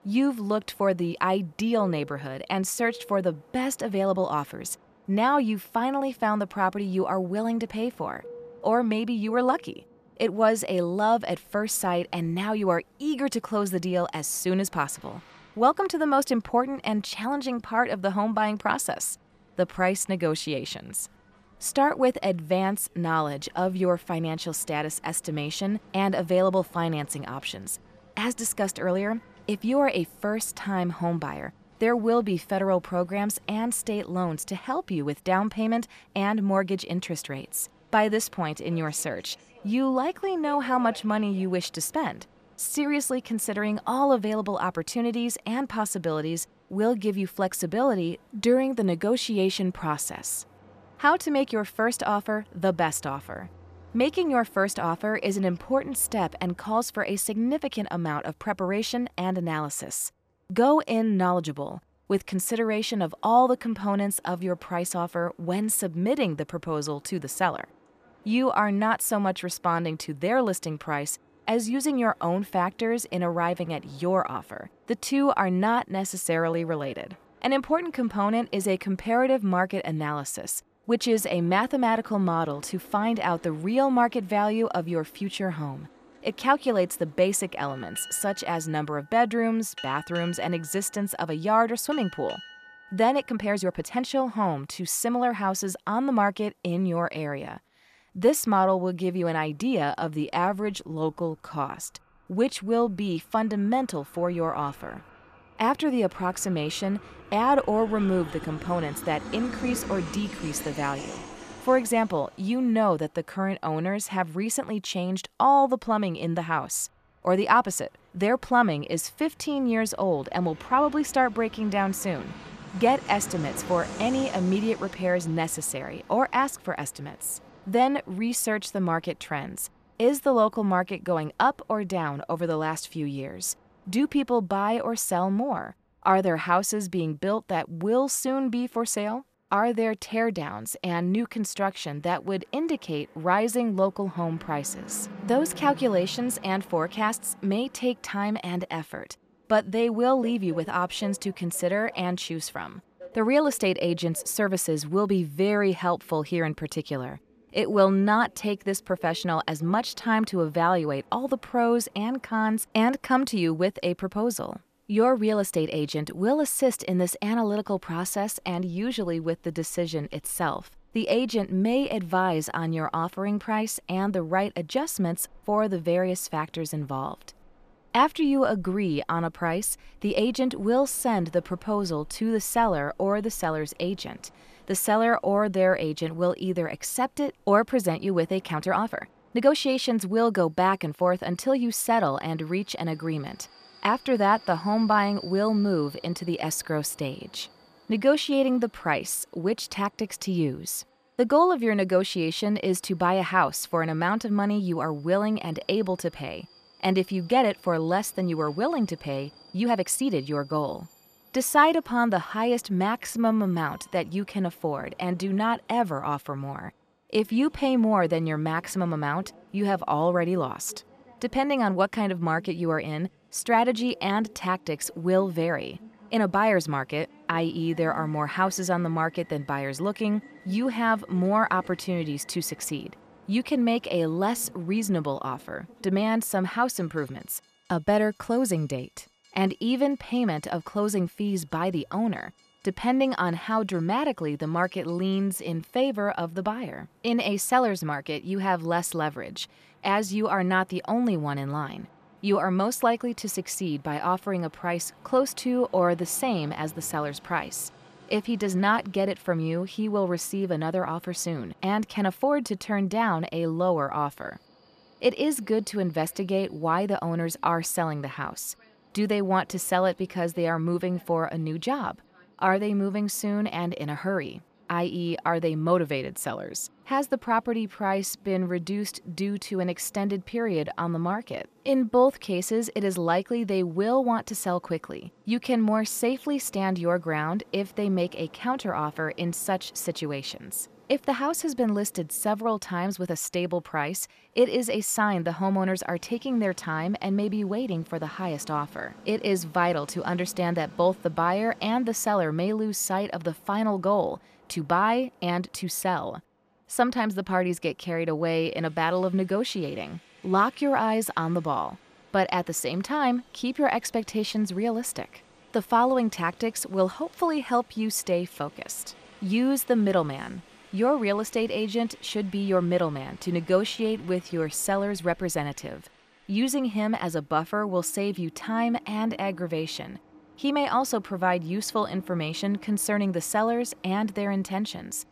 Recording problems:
train or aircraft noise; faint; throughout; 25 dB below the speech
uneven, jittery; strongly; from 1:33 to 5:25

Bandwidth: 14.5 kHz